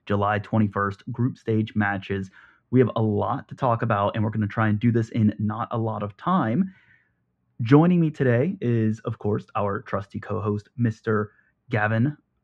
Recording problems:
muffled; very; fading above 1.5 kHz

